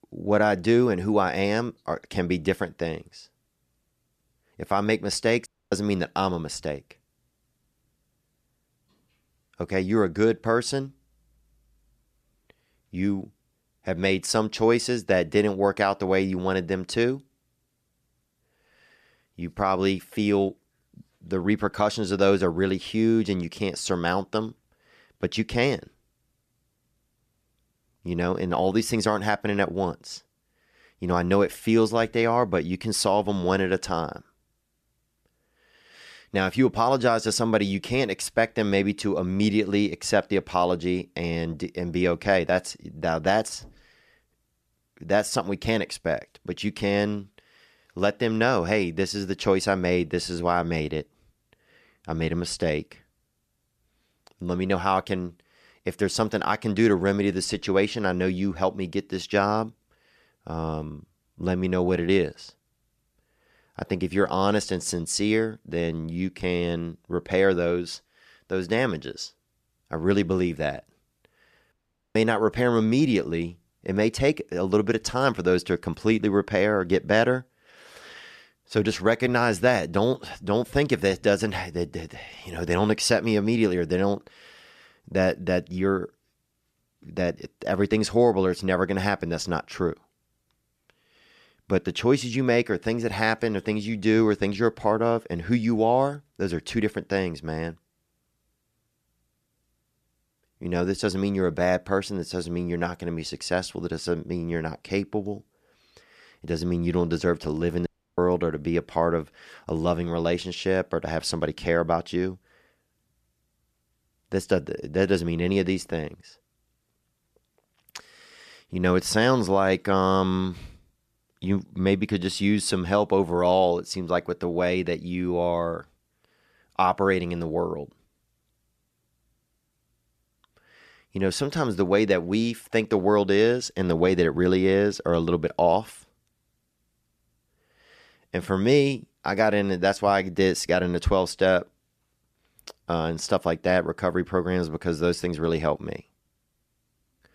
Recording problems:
audio cutting out; at 5.5 s, at 1:12 and at 1:48

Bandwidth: 14.5 kHz